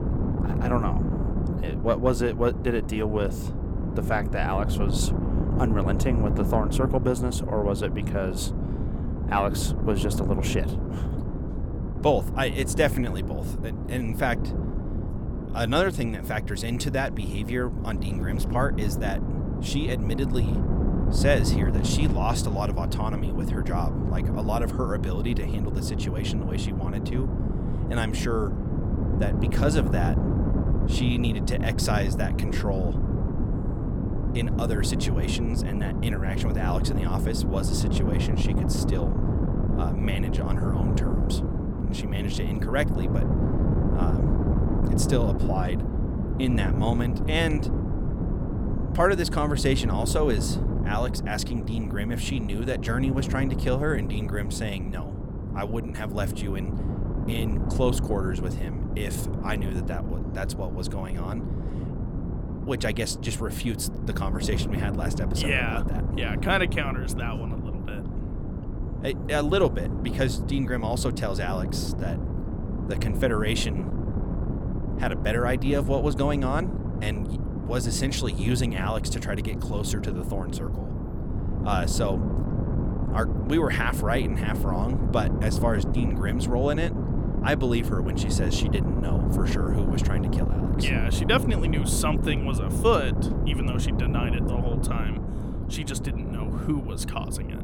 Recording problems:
wind noise on the microphone; heavy; 6 dB below the speech

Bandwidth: 17 kHz